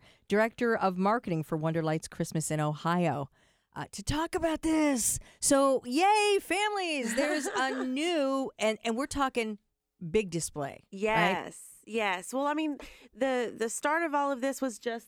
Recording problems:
none

